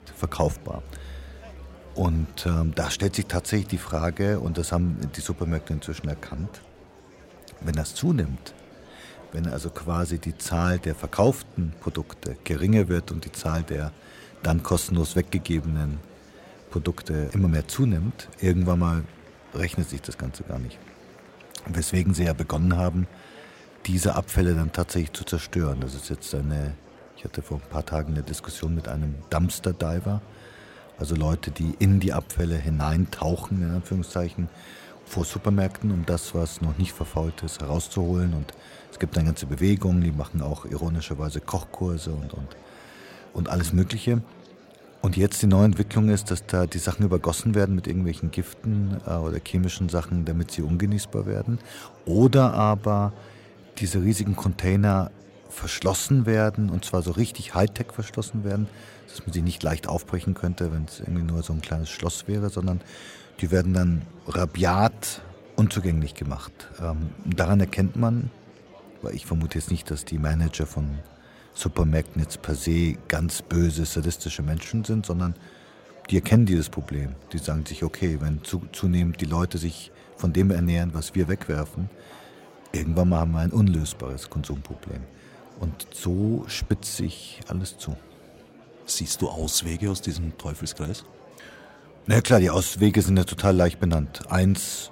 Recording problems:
murmuring crowd; faint; throughout; 25 dB below the speech

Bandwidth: 16 kHz